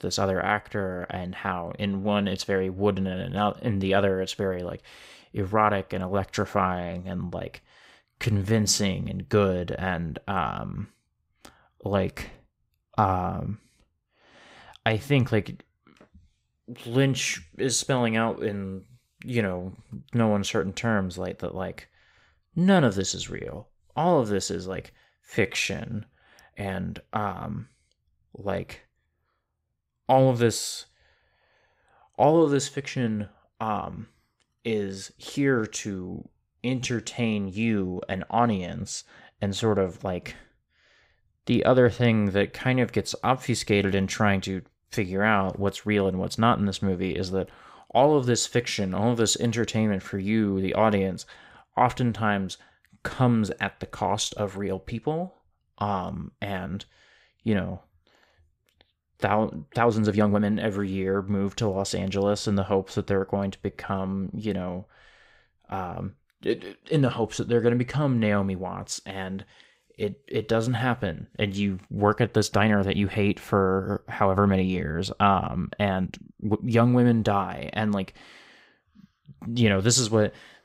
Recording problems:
uneven, jittery; strongly; from 8 s to 1:17

